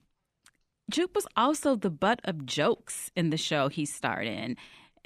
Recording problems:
none

